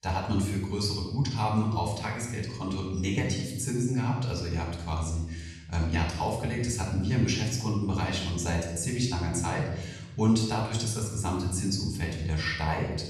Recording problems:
off-mic speech; far
room echo; noticeable; dies away in 1.2 s

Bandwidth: 14.5 kHz